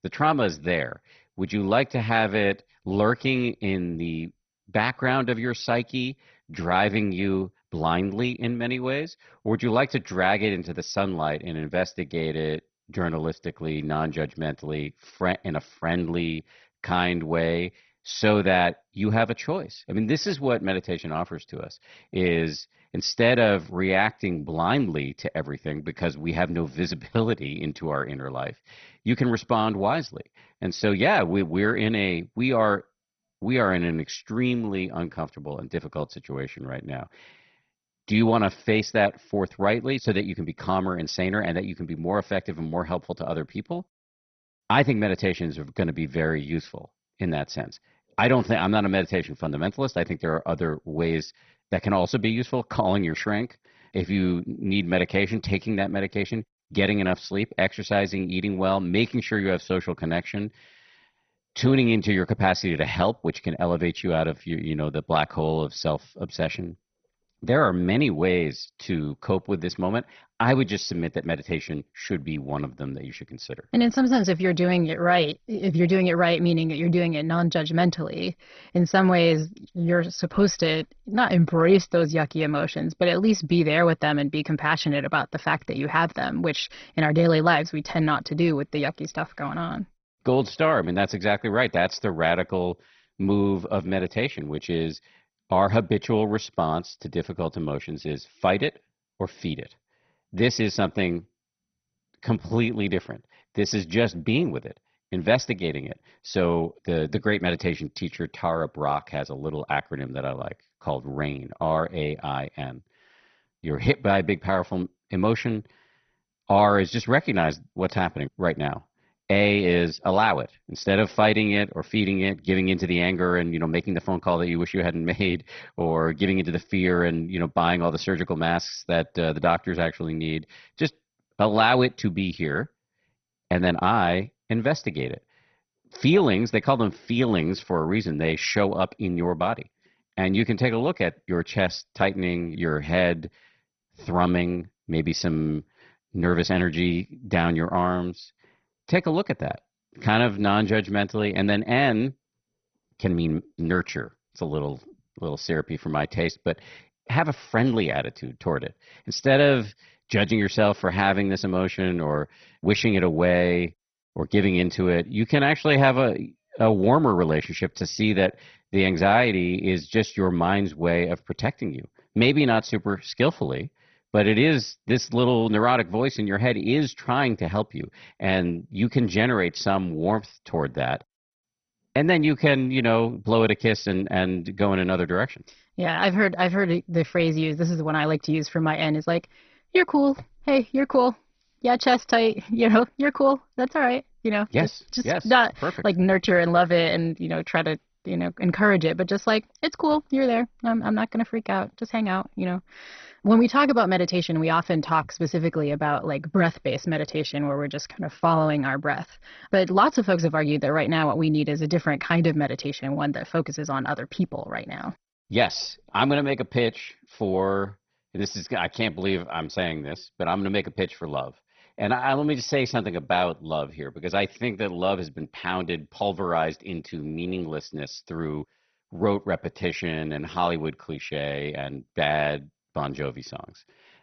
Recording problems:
garbled, watery; badly; nothing above 6 kHz

